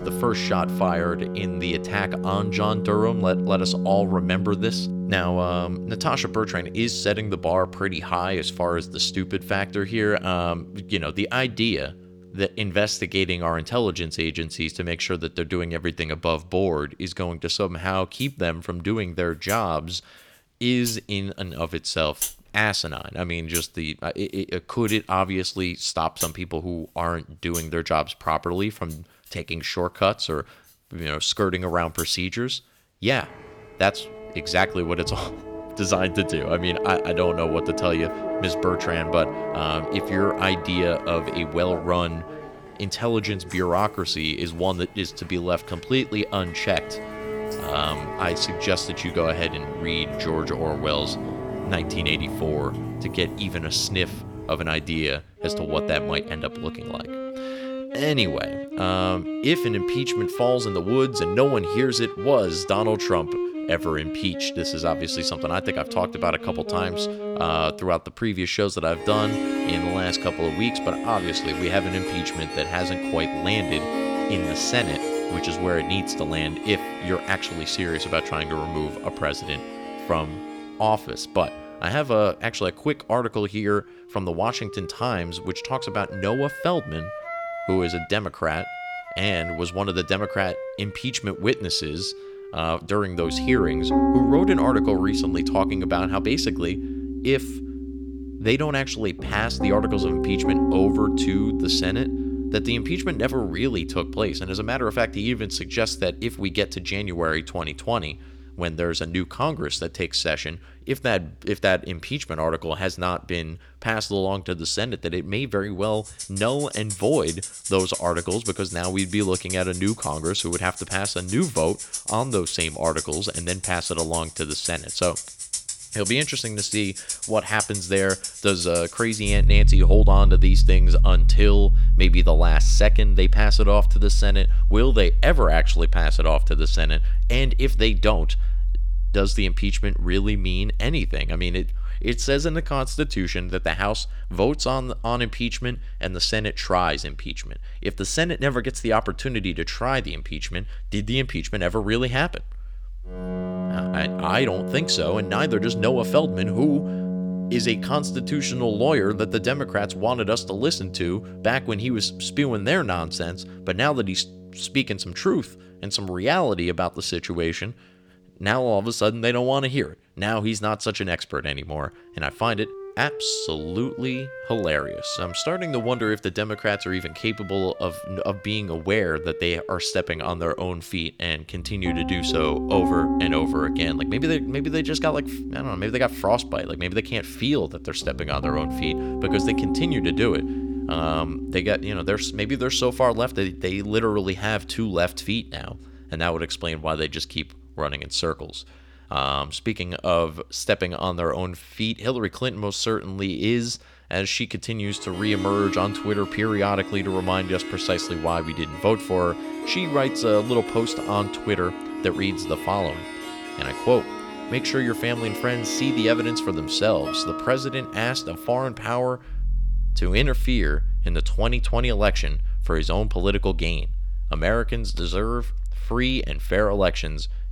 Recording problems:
background music; loud; throughout; 3 dB below the speech

